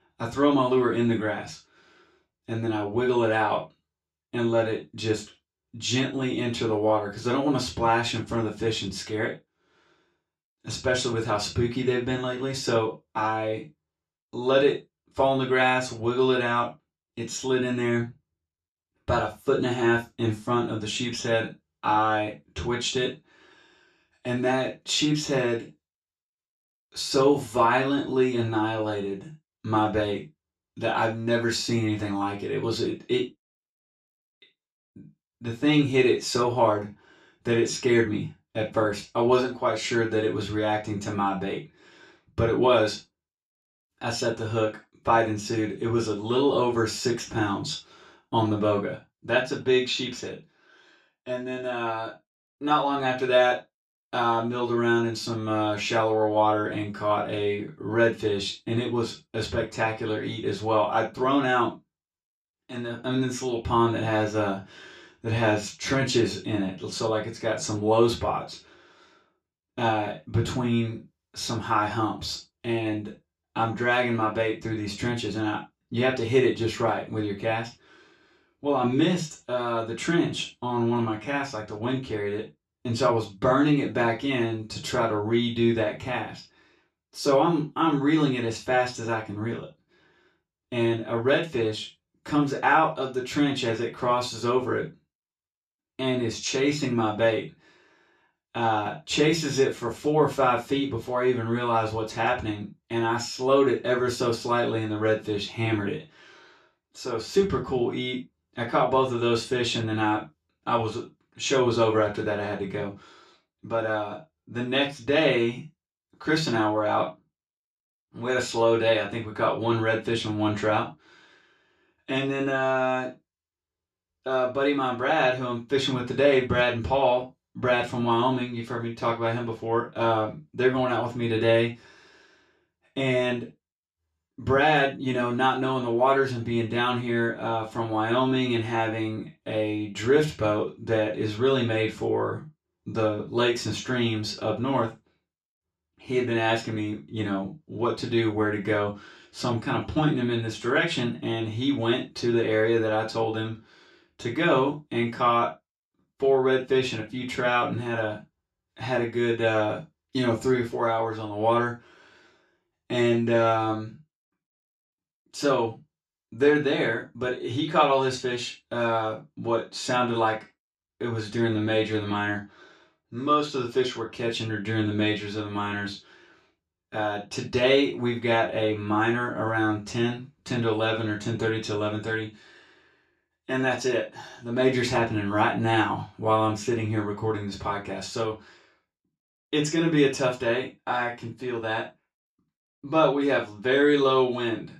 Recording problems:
off-mic speech; far
room echo; slight; dies away in 0.2 s

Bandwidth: 14 kHz